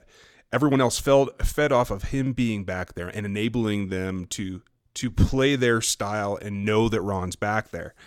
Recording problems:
uneven, jittery; strongly; from 0.5 to 7 s

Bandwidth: 17 kHz